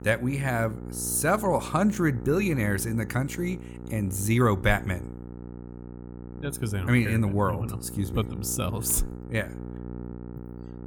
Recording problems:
electrical hum; noticeable; throughout; 60 Hz, 15 dB below the speech

